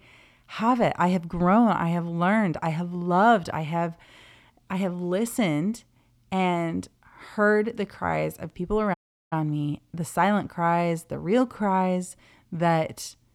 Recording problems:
audio cutting out; at 9 s

